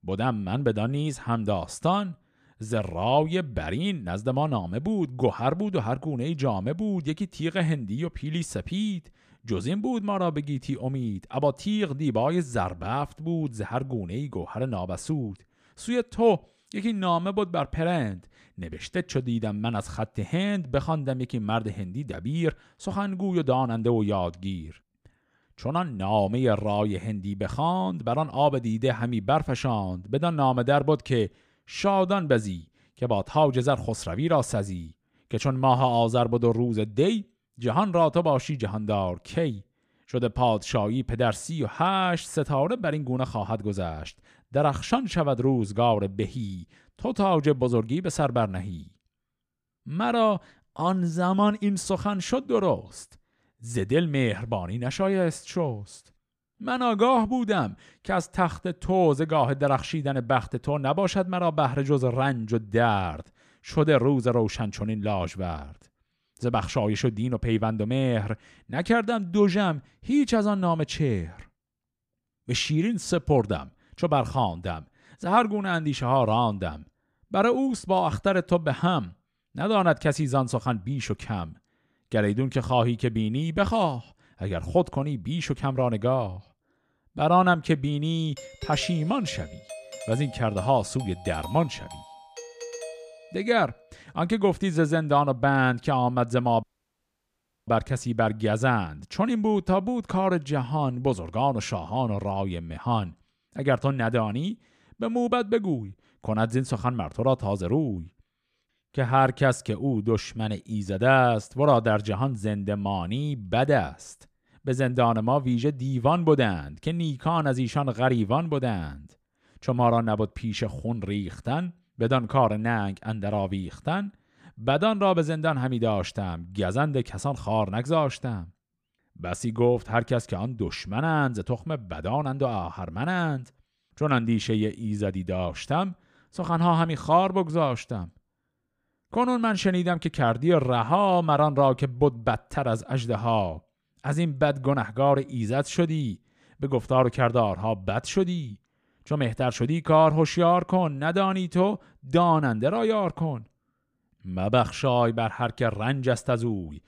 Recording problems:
doorbell; faint; from 1:28 to 1:34; peak 10 dB below the speech
audio cutting out; at 1:37 for 1 s

